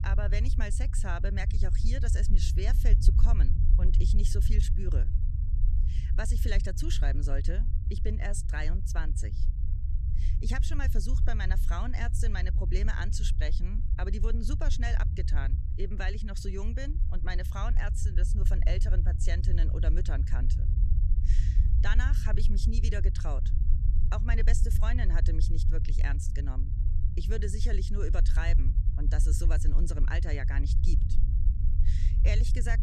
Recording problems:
low rumble; loud; throughout; 8 dB below the speech

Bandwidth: 14 kHz